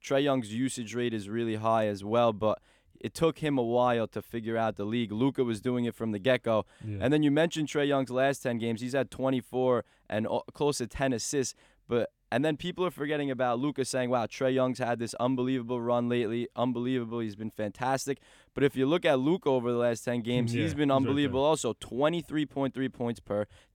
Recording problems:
none

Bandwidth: 18 kHz